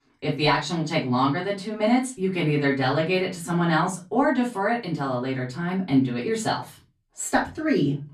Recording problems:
off-mic speech; far
room echo; very slight; dies away in 0.3 s

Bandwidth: 13.5 kHz